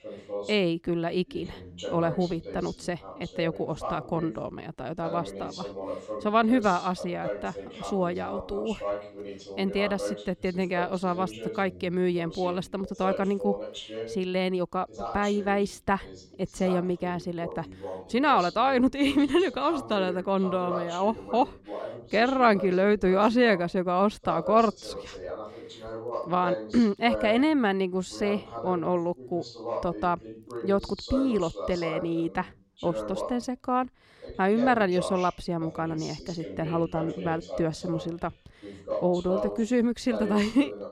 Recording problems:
voice in the background; noticeable; throughout; 10 dB below the speech

